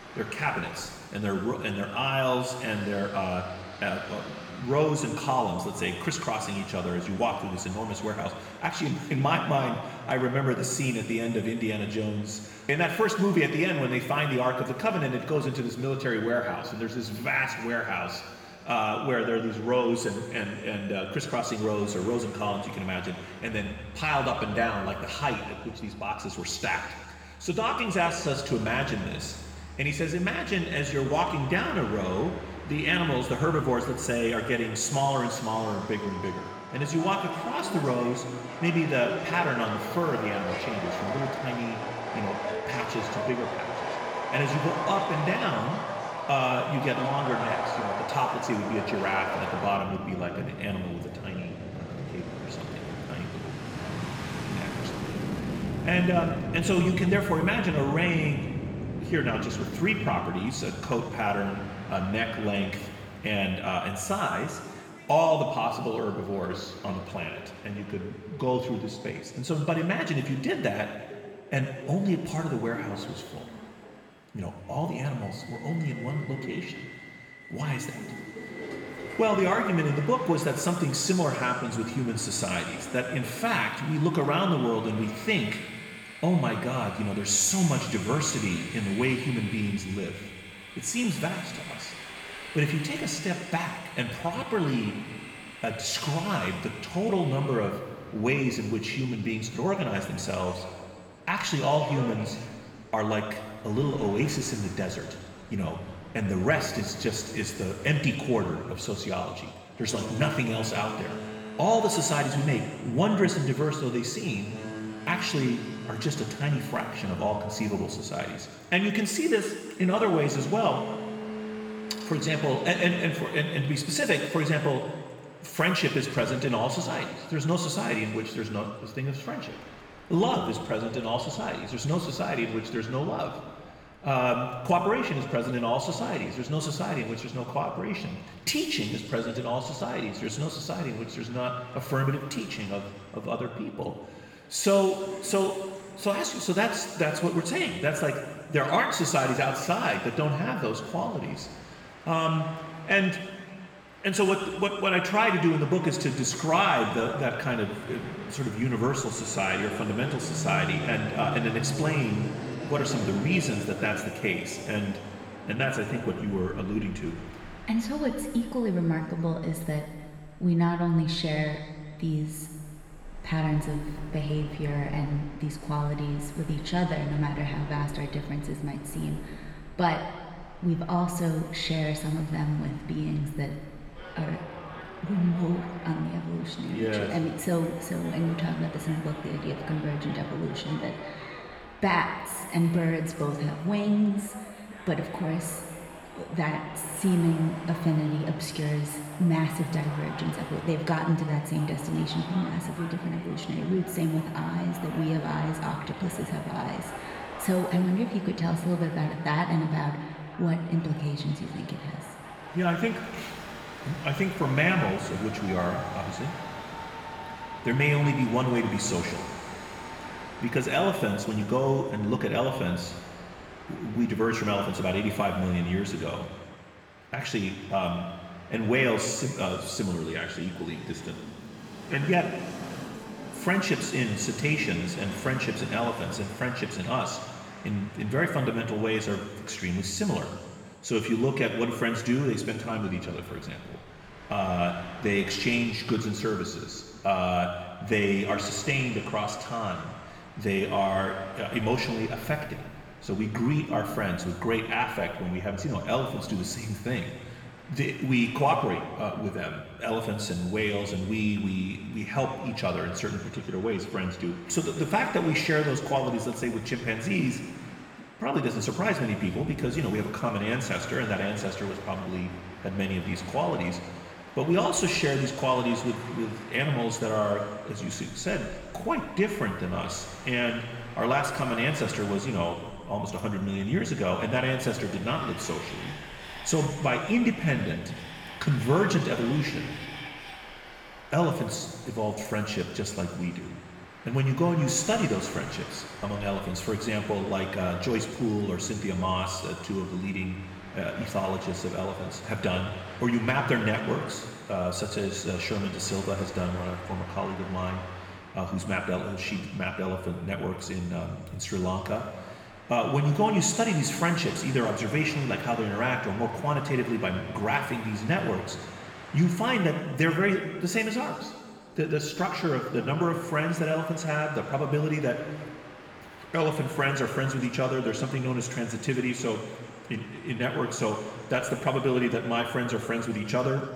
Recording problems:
room echo; noticeable; dies away in 1.7 s
off-mic speech; somewhat distant
train or aircraft noise; noticeable; throughout; 10 dB below the speech

